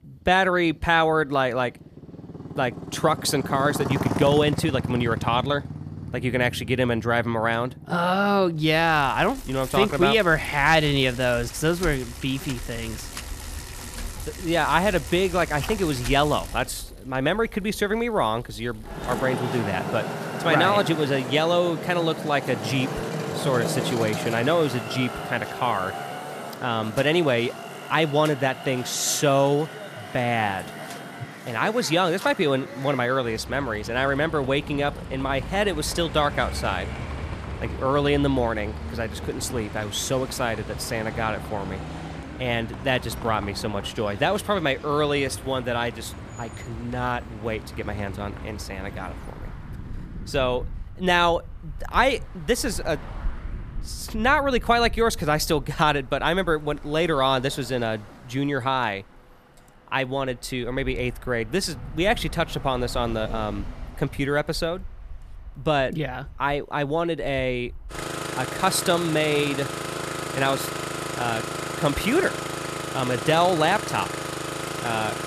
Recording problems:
traffic noise; loud; throughout; 10 dB below the speech

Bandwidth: 14.5 kHz